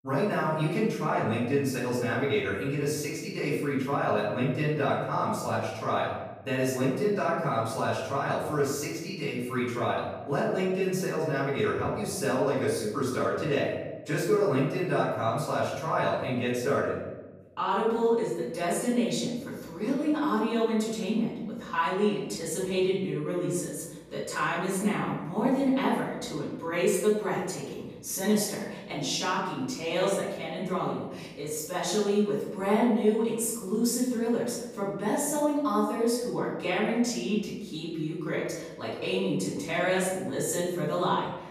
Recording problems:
off-mic speech; far
room echo; noticeable; dies away in 1 s

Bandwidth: 15 kHz